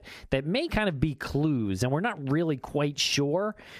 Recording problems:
squashed, flat; somewhat

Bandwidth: 14.5 kHz